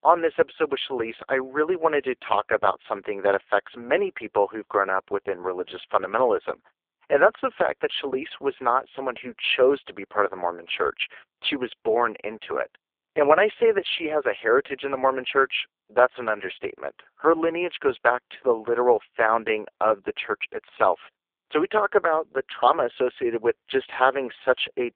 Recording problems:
phone-call audio; poor line

